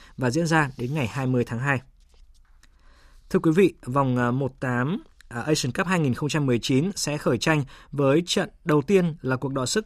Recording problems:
none

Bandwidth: 15 kHz